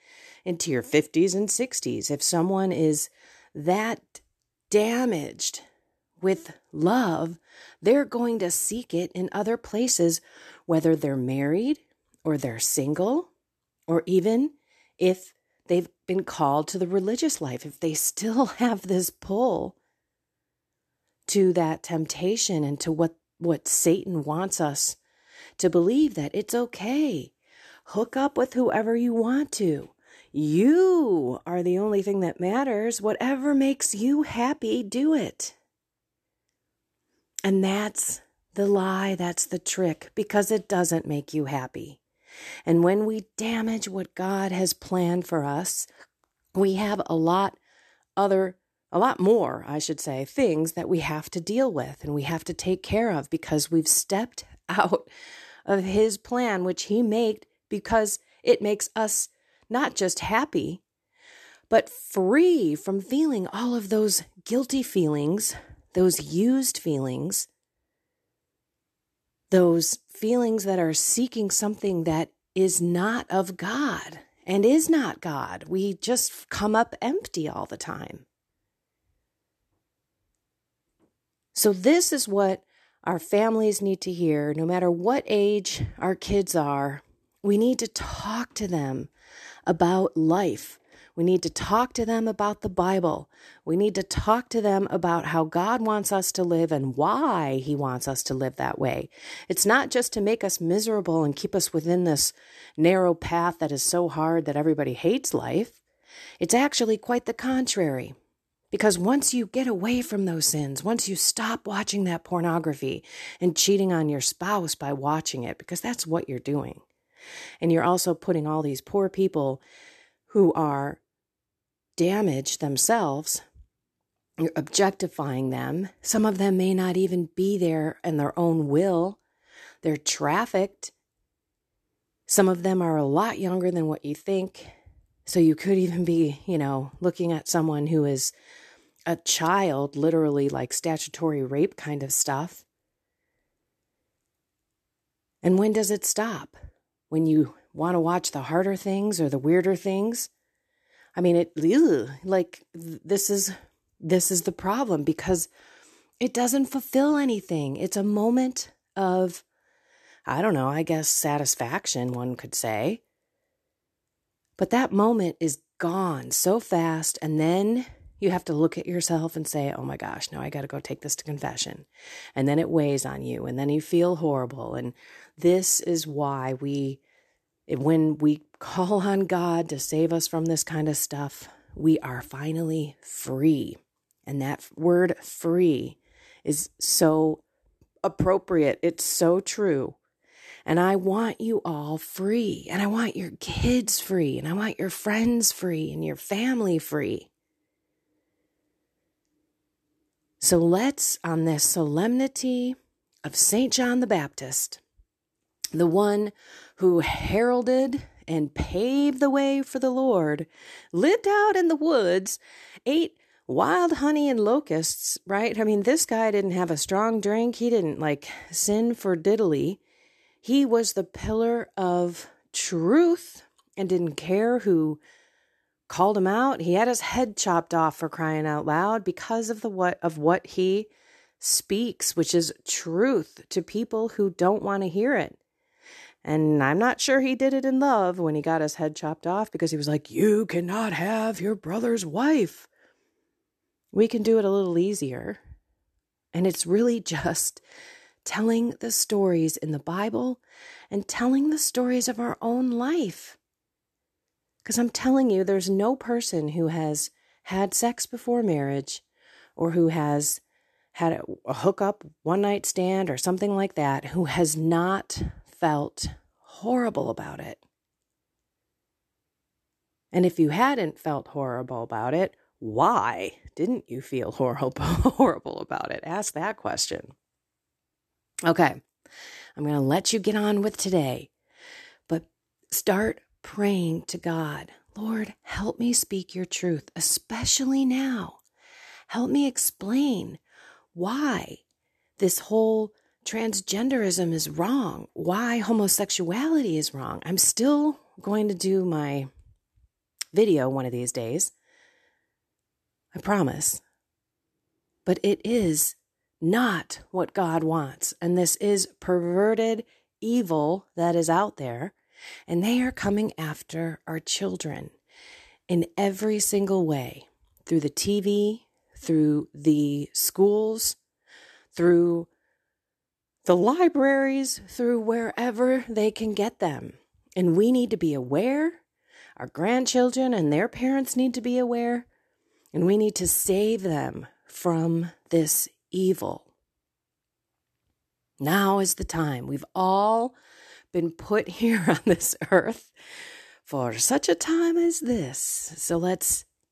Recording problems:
none

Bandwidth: 13.5 kHz